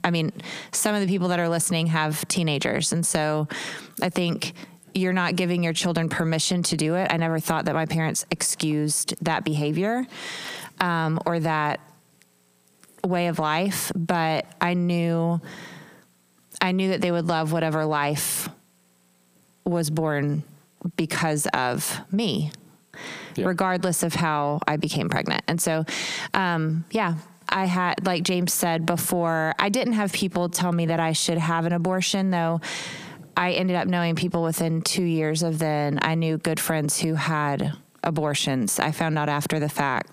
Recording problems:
squashed, flat; heavily

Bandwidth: 15 kHz